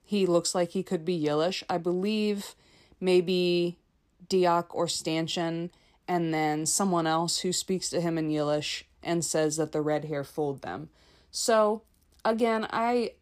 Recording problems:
none

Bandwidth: 14.5 kHz